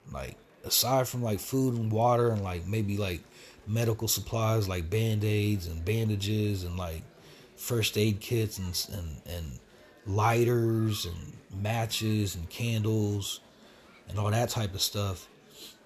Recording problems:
murmuring crowd; faint; throughout; 25 dB below the speech

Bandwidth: 13.5 kHz